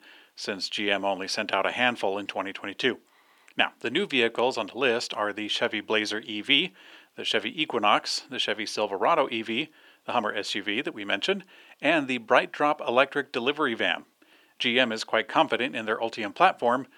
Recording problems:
thin; somewhat; fading below 350 Hz

